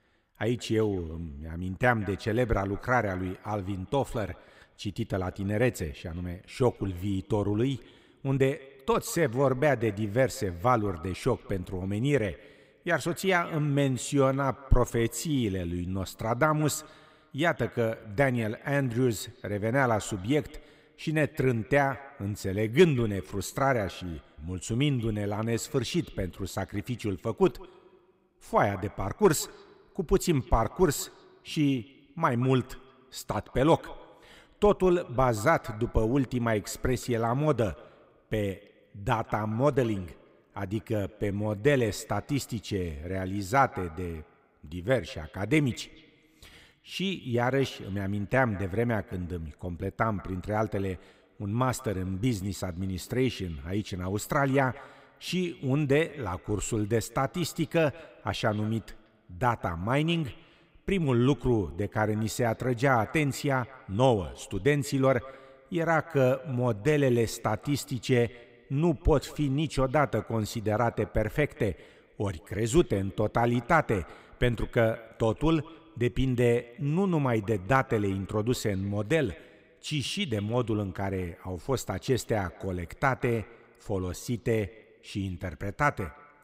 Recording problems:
echo of what is said; faint; throughout; 180 ms later, 25 dB below the speech

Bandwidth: 15.5 kHz